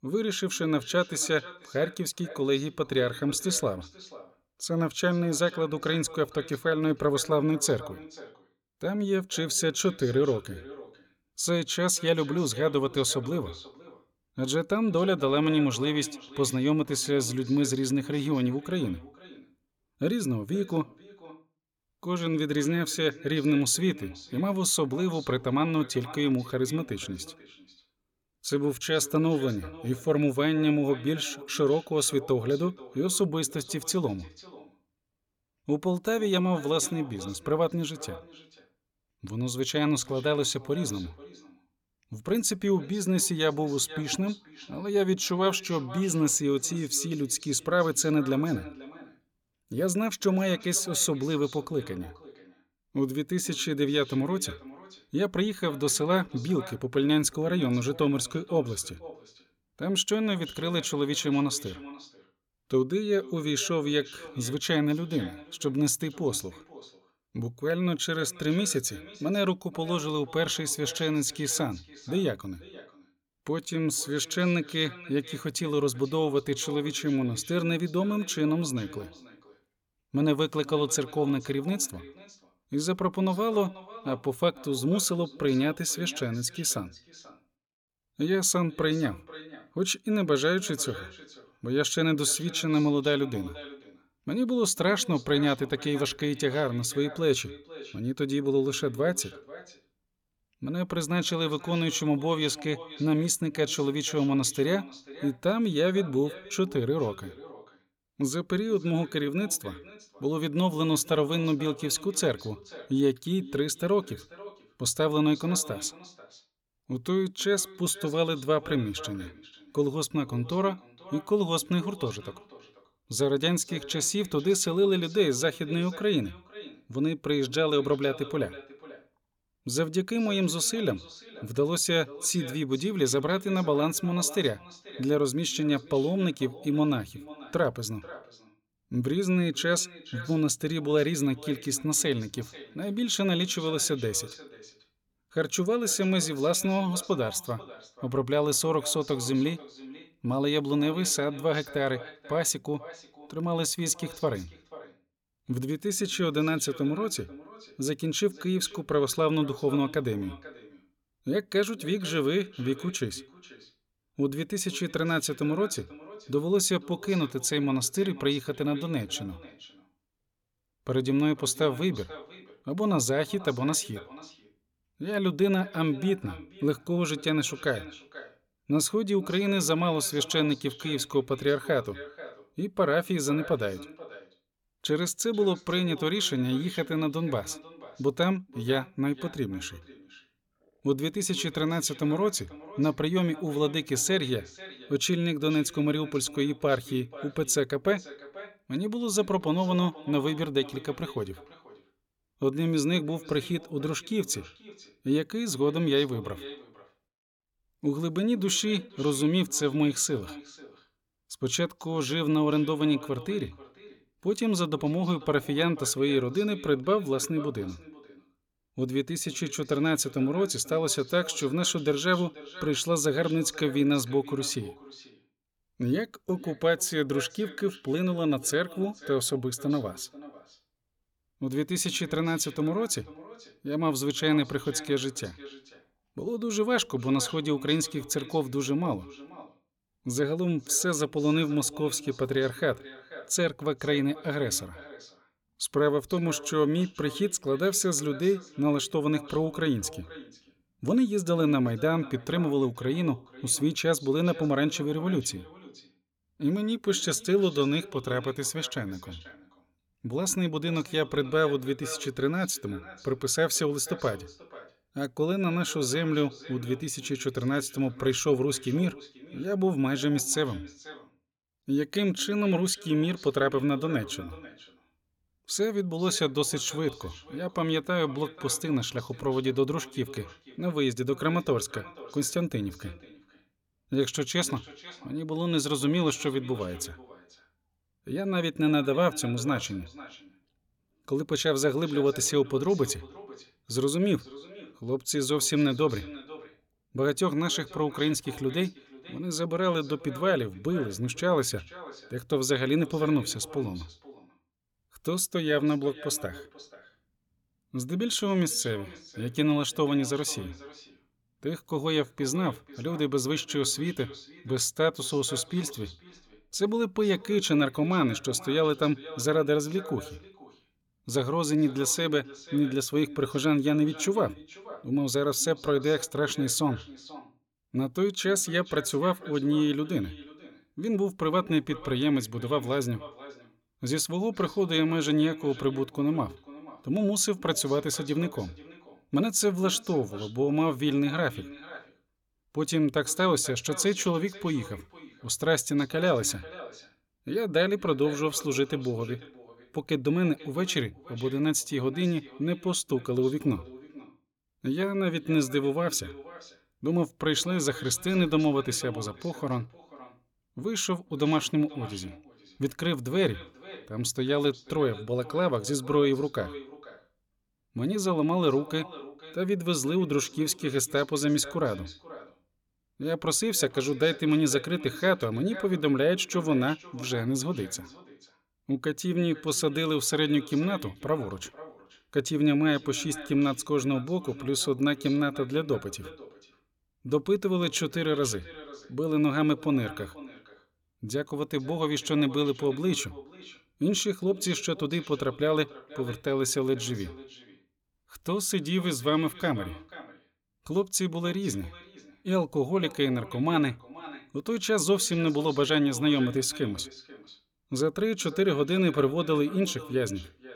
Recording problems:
echo of what is said; faint; throughout; 490 ms later, 20 dB below the speech

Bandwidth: 17.5 kHz